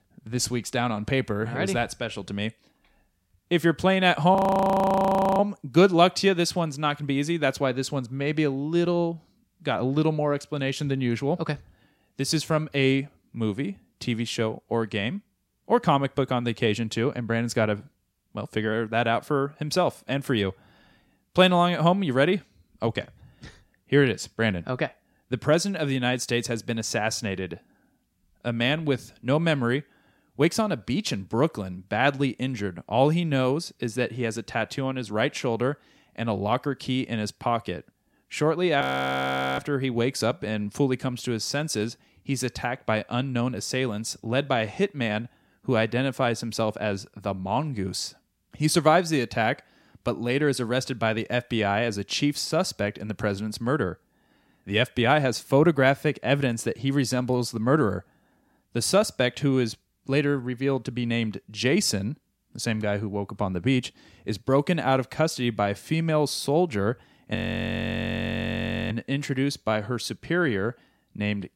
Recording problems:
audio freezing; at 4.5 s for 1 s, at 39 s for 1 s and at 1:07 for 1.5 s

